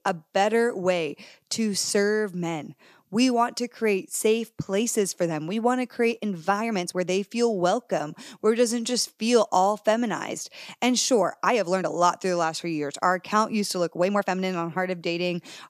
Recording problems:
uneven, jittery; strongly; from 6 to 14 s

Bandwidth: 14.5 kHz